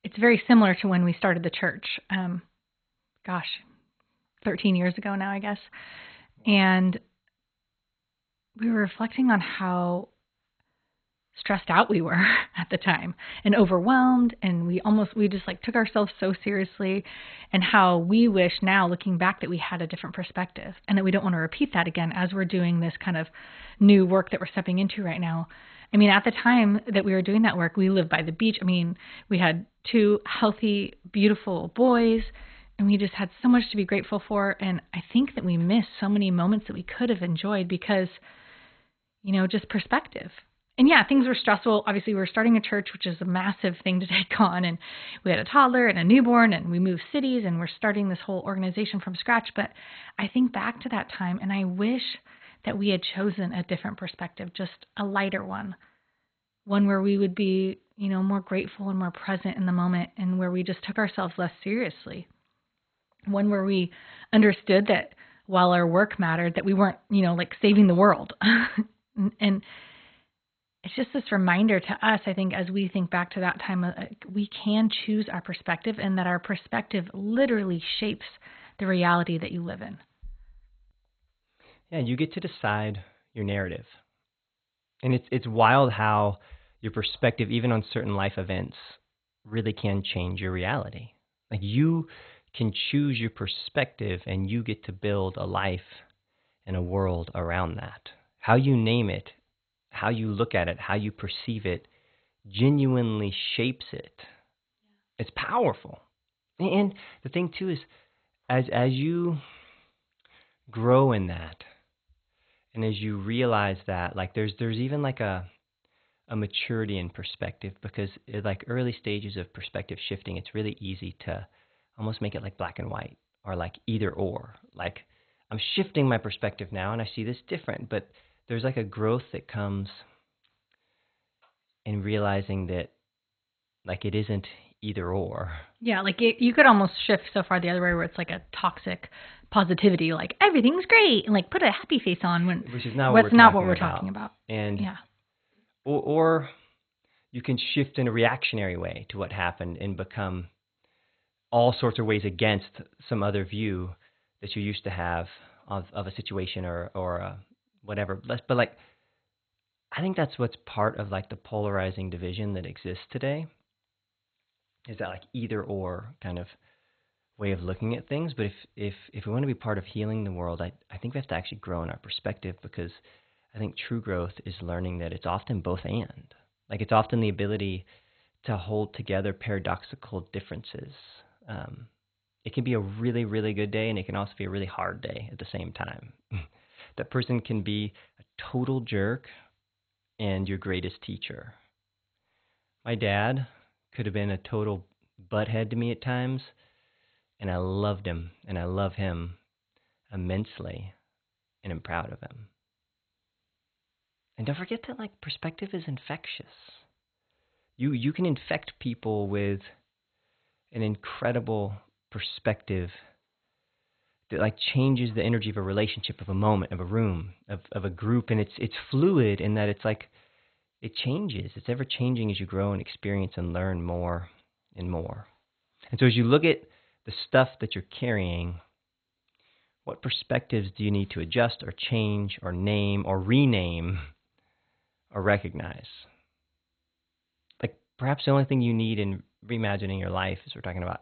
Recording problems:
garbled, watery; badly; nothing above 4 kHz

